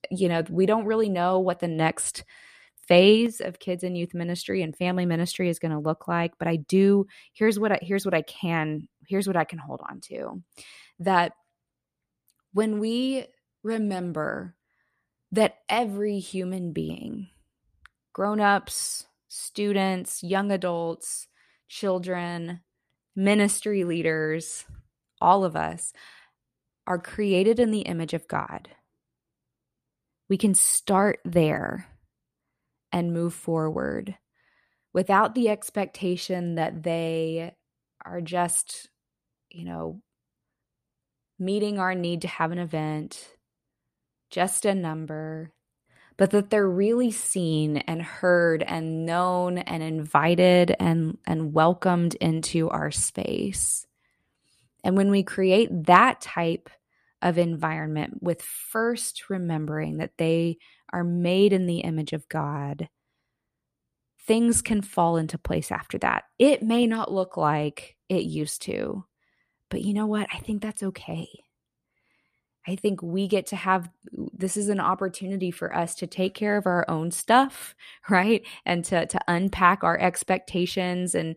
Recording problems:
none

